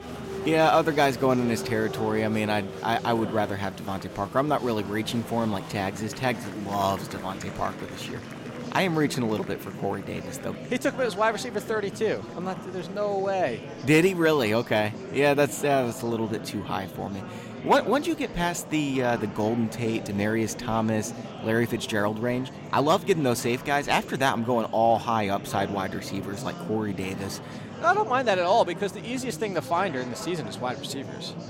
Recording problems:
murmuring crowd; noticeable; throughout; 10 dB below the speech

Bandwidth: 16 kHz